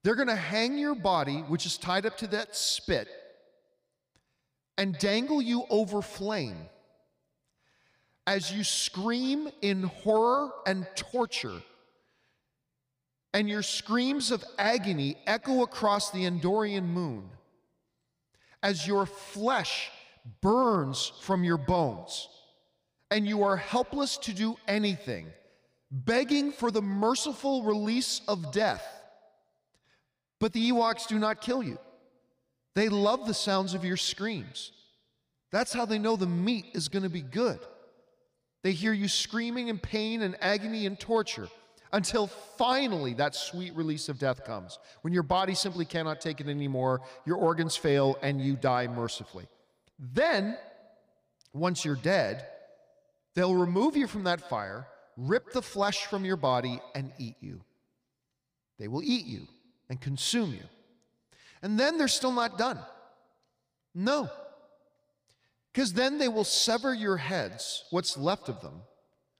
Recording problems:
echo of what is said; faint; throughout; 150 ms later, 20 dB below the speech

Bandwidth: 15 kHz